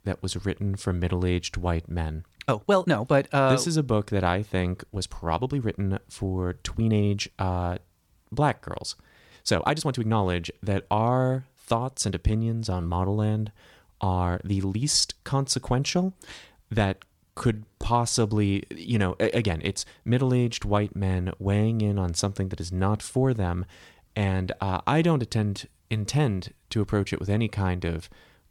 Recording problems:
uneven, jittery; strongly; from 2.5 to 25 s

